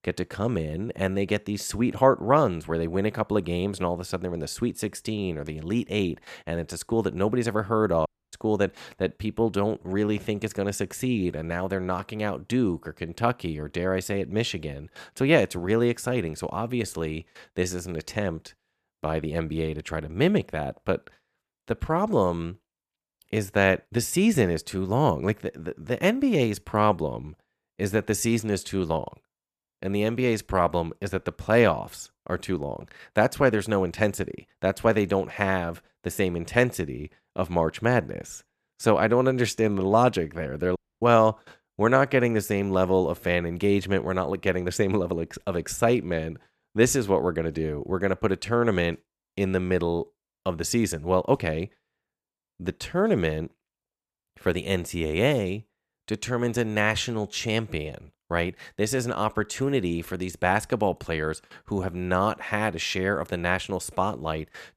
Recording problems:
audio cutting out; at 8 s and at 41 s

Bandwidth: 14.5 kHz